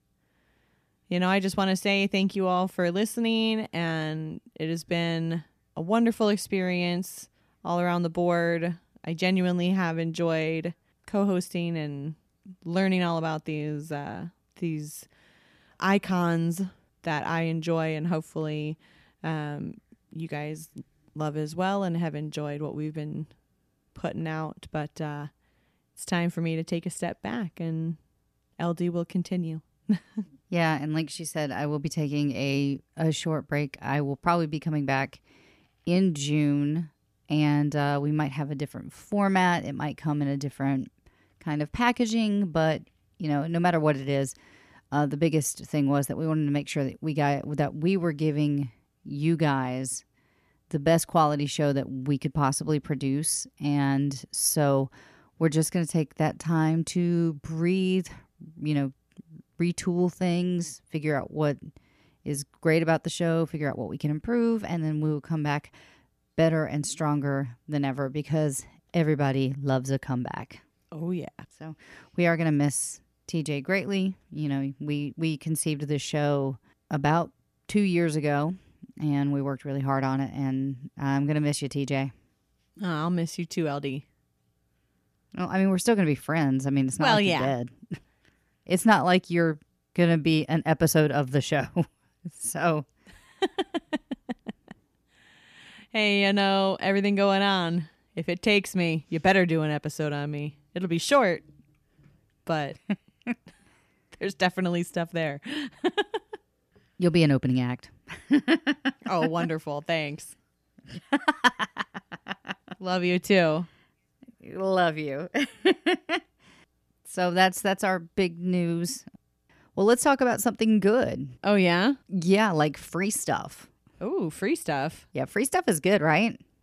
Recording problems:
none

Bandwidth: 14.5 kHz